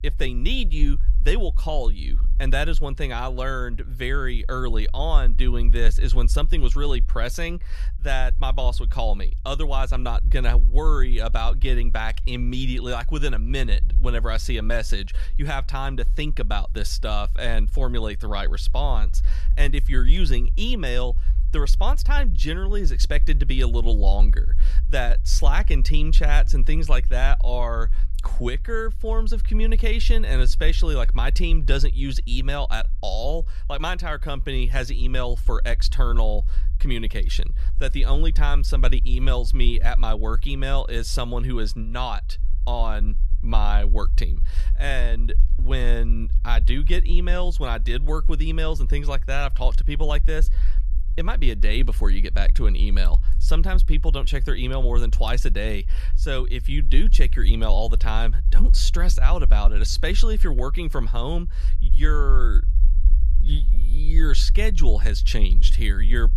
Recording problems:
low rumble; noticeable; throughout; 20 dB below the speech

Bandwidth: 14.5 kHz